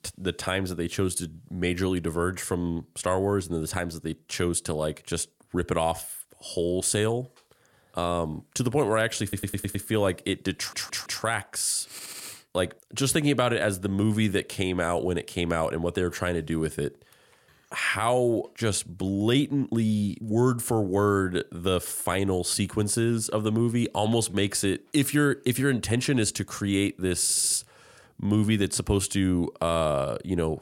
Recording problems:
audio stuttering; 4 times, first at 9 s

